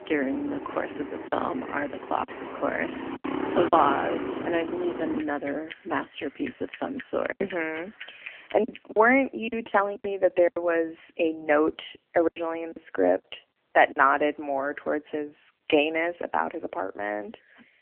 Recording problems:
phone-call audio; poor line; nothing above 3 kHz
traffic noise; loud; until 8.5 s; 9 dB below the speech
choppy; occasionally; 4% of the speech affected

